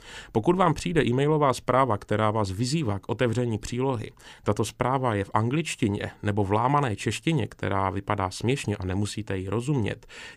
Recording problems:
none

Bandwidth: 15 kHz